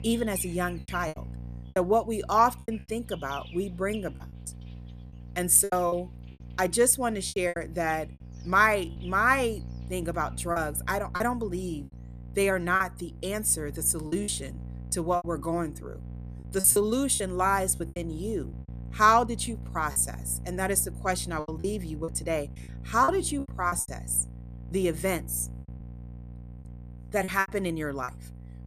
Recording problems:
electrical hum; faint; throughout; 60 Hz, 25 dB below the speech
animal sounds; faint; throughout; 25 dB below the speech
choppy; very; 9% of the speech affected

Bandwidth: 14.5 kHz